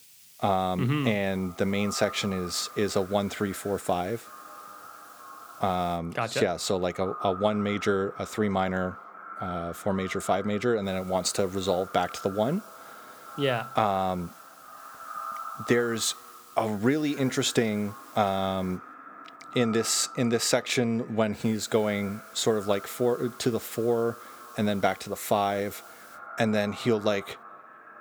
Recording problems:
echo of what is said; noticeable; throughout; 420 ms later, 15 dB below the speech
hiss; faint; until 6 s, from 11 to 19 s and from 21 to 26 s; 25 dB below the speech

